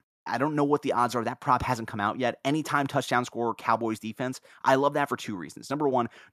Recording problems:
none

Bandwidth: 14.5 kHz